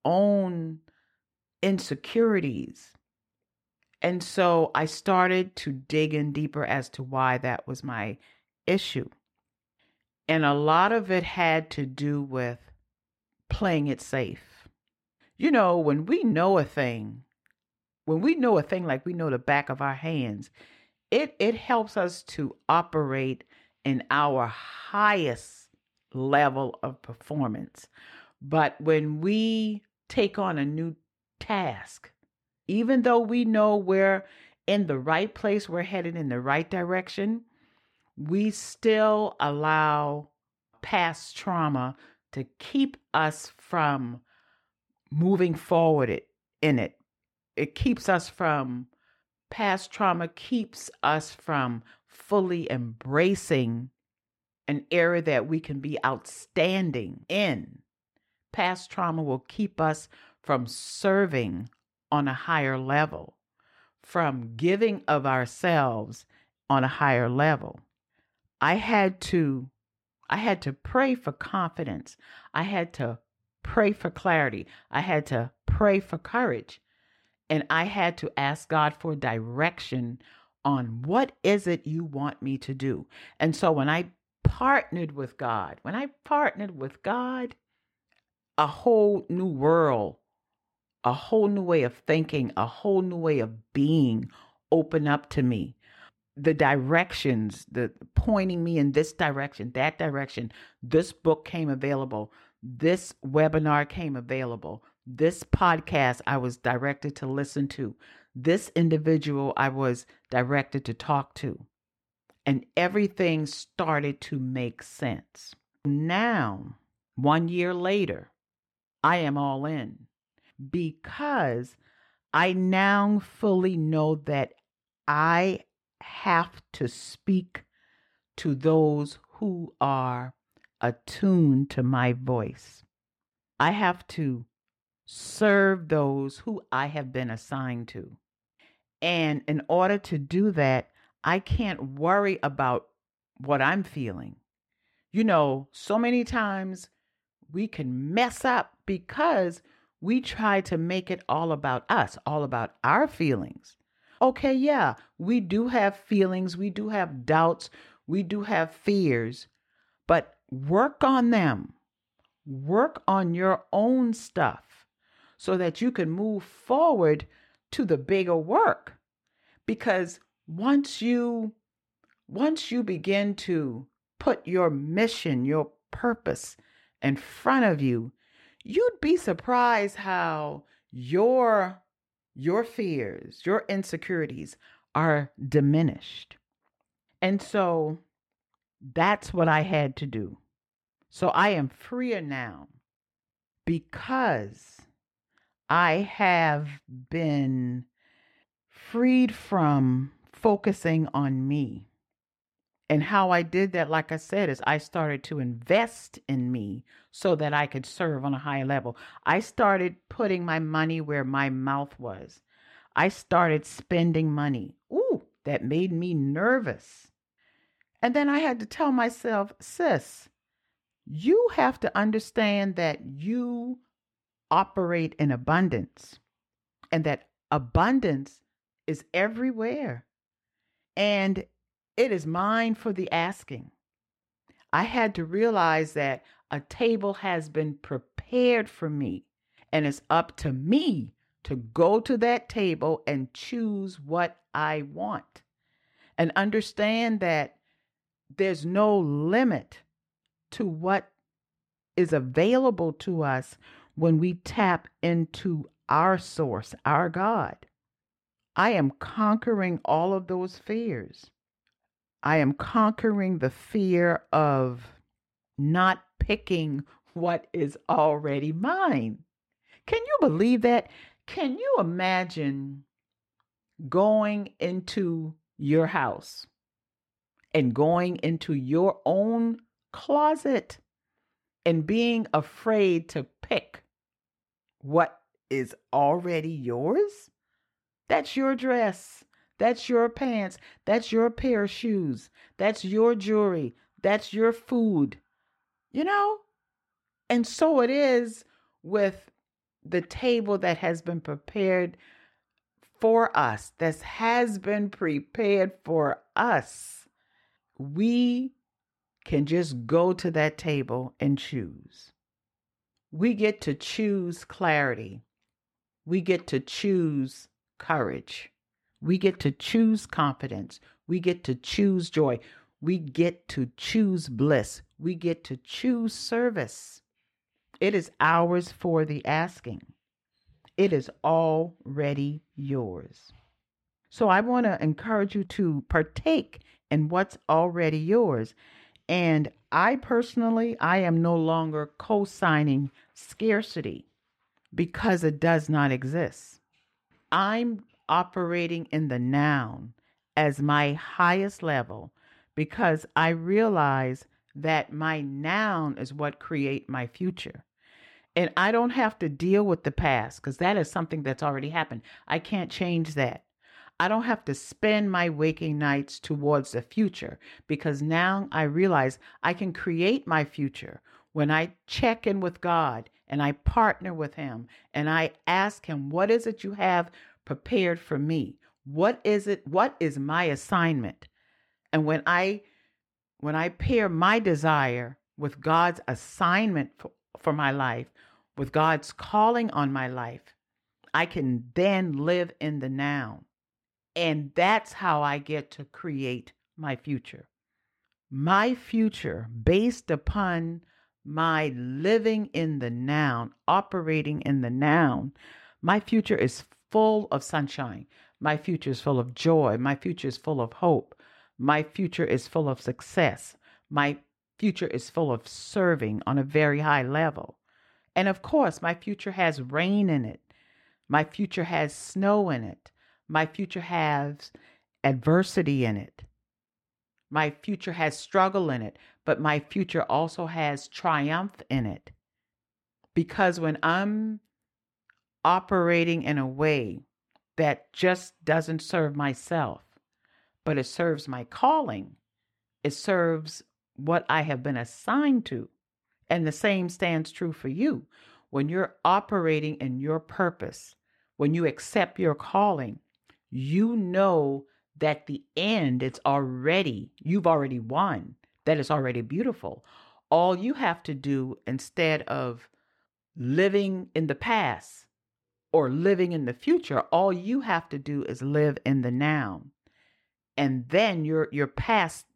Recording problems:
muffled; slightly; fading above 3.5 kHz

